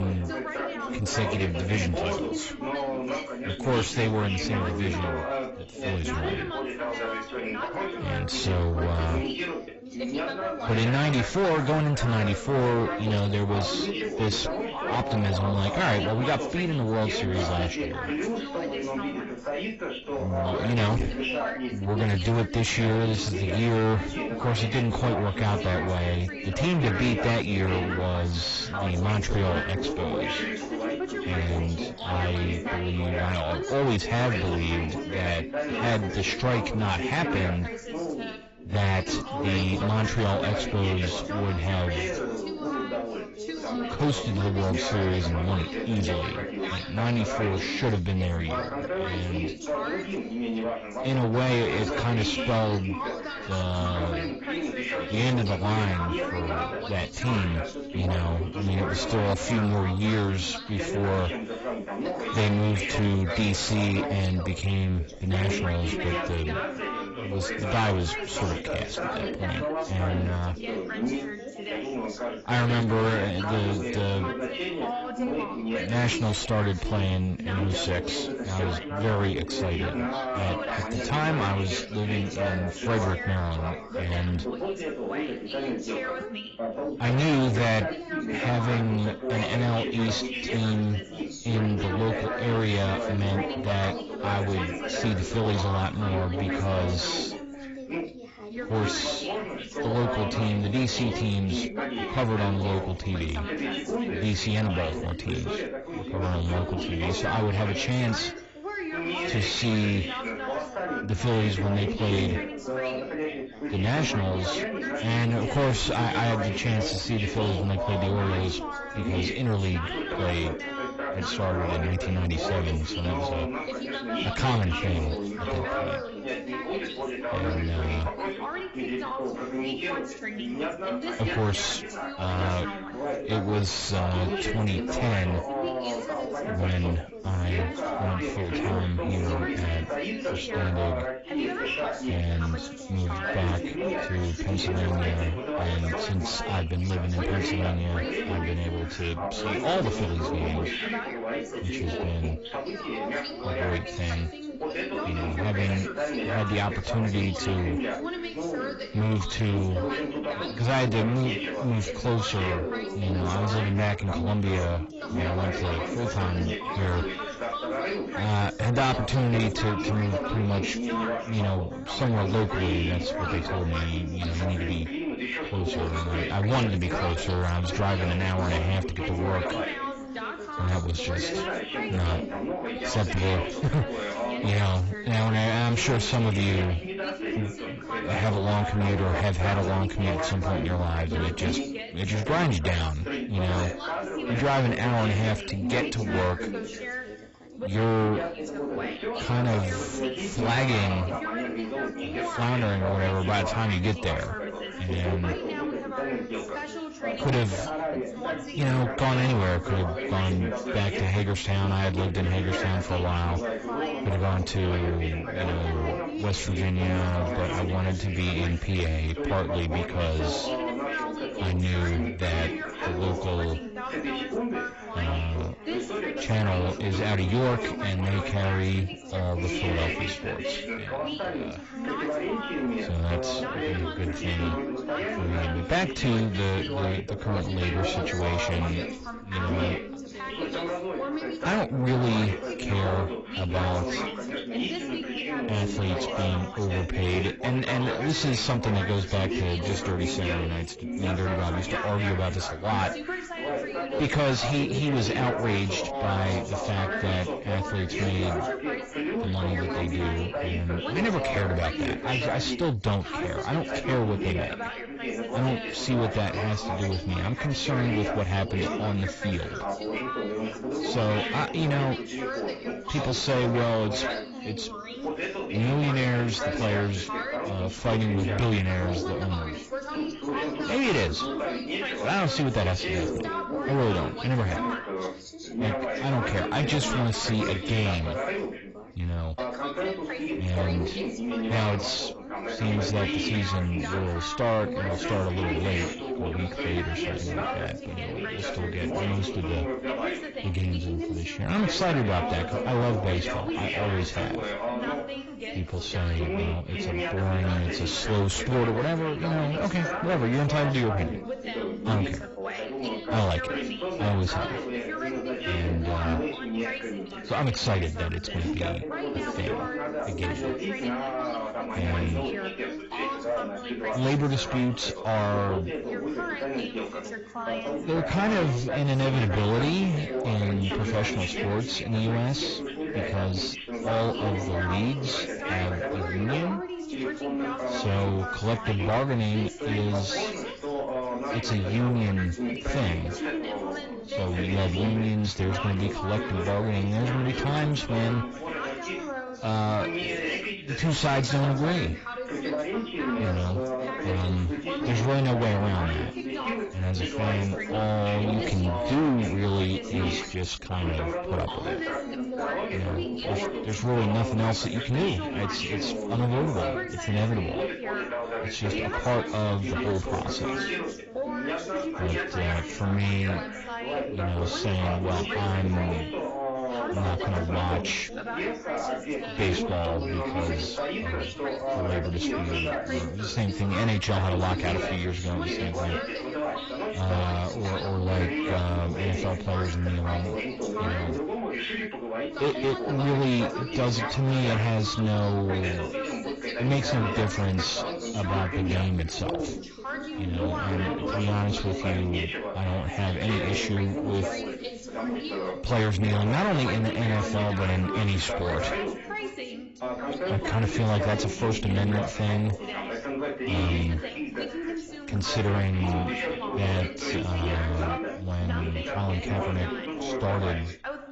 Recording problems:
distortion; heavy; 5 dB below the speech
garbled, watery; badly; nothing above 7.5 kHz
background chatter; loud; throughout; 3 voices, 4 dB below the speech
abrupt cut into speech; at the start

